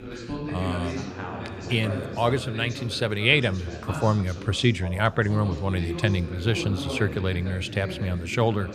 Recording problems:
background chatter; loud; throughout; 2 voices, 9 dB below the speech

